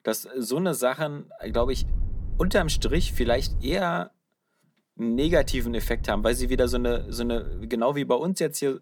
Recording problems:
low rumble; faint; from 1.5 to 3.5 s and from 5 to 7.5 s; 25 dB below the speech

